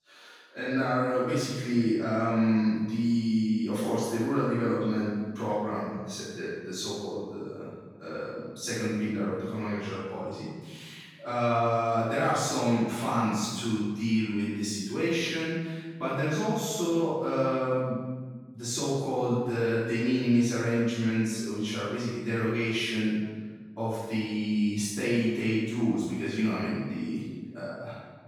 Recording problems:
room echo; strong; dies away in 1.2 s
off-mic speech; far

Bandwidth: 18.5 kHz